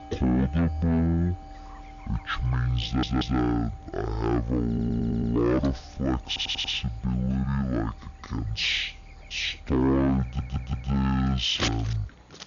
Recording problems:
wrong speed and pitch; too slow and too low; 0.5 times normal speed
distortion; slight; 10 dB below the speech
household noises; noticeable; throughout; 15 dB below the speech
electrical hum; faint; throughout; 60 Hz, 25 dB below the speech
audio stuttering; 4 times, first at 3 s

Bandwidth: 7 kHz